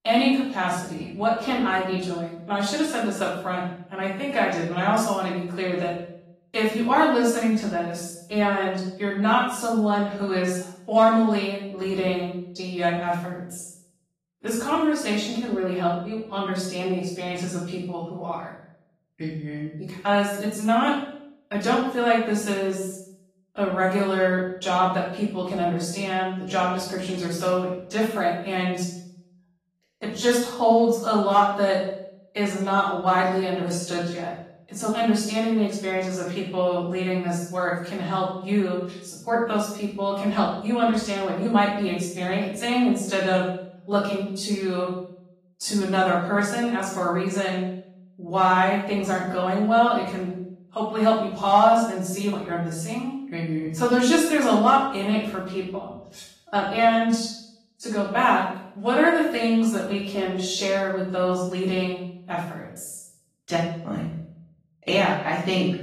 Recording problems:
off-mic speech; far
room echo; noticeable; dies away in 0.6 s
garbled, watery; slightly; nothing above 14 kHz

